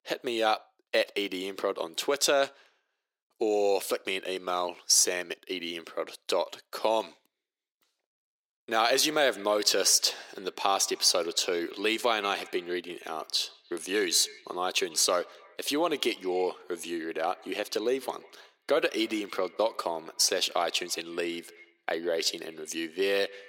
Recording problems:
thin; very; fading below 350 Hz
echo of what is said; faint; from 8.5 s on; 150 ms later, 25 dB below the speech

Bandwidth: 16.5 kHz